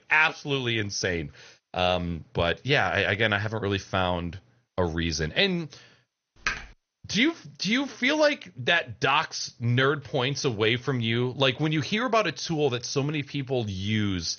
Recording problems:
garbled, watery; slightly; nothing above 6.5 kHz
keyboard typing; noticeable; at 6.5 s; peak 5 dB below the speech

